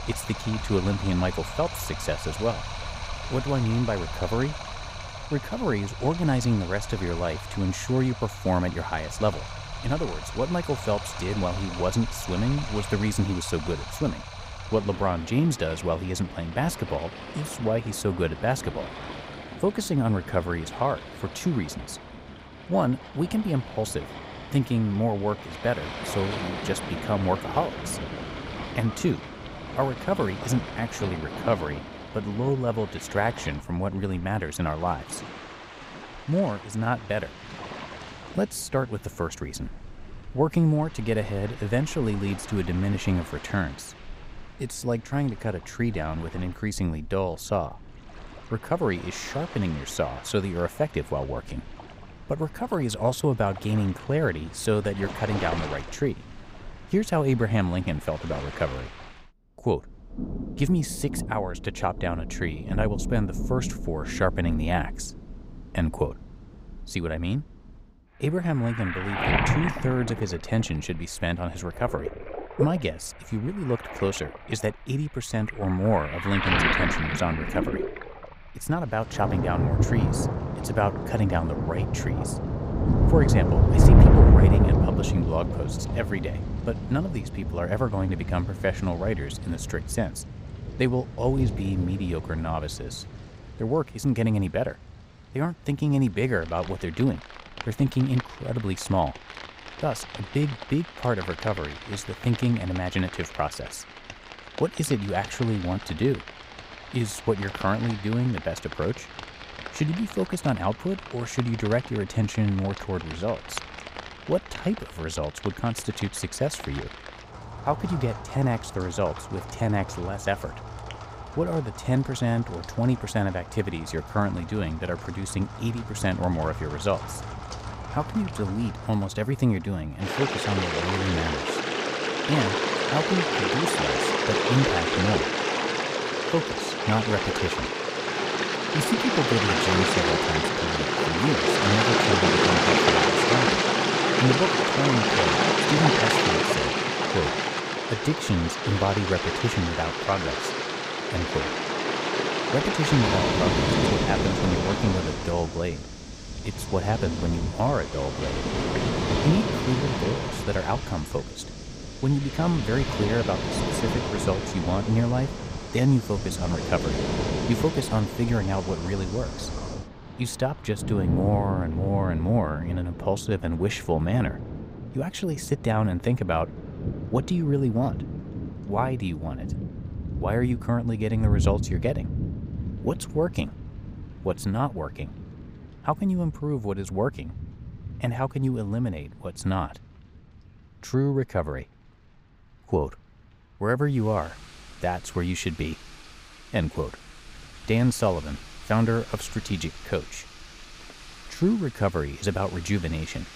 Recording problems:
rain or running water; loud; throughout; as loud as the speech

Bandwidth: 15.5 kHz